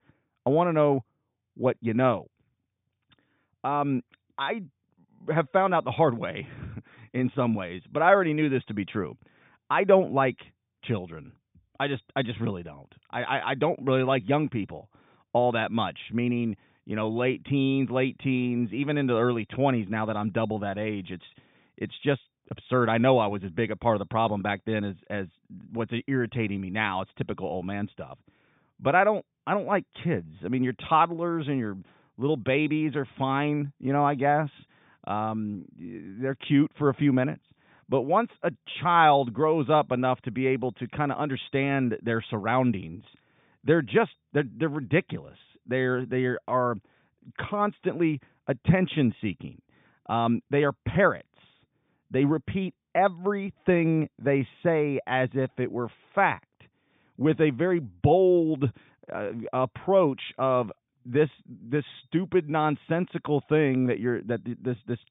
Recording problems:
high frequencies cut off; severe; nothing above 3.5 kHz

